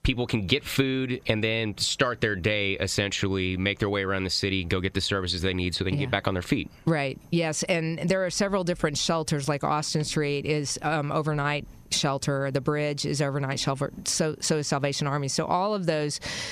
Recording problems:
squashed, flat; somewhat

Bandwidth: 14.5 kHz